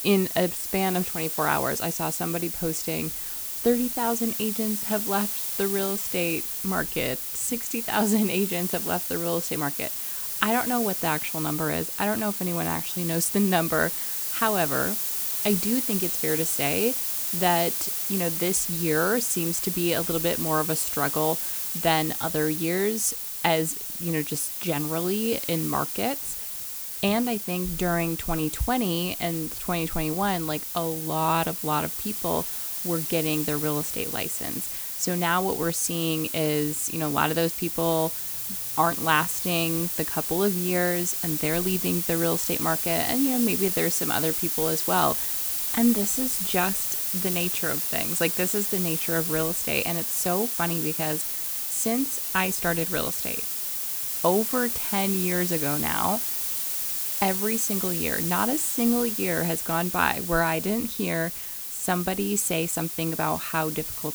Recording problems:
hiss; loud; throughout; as loud as the speech

